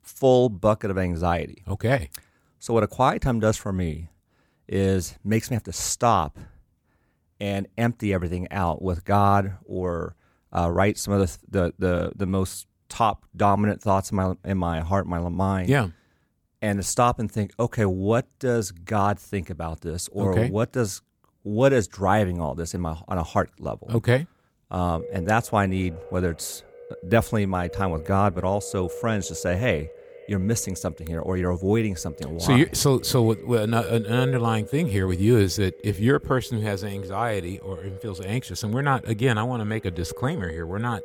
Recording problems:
echo of what is said; noticeable; from 25 s on; 150 ms later, 15 dB below the speech

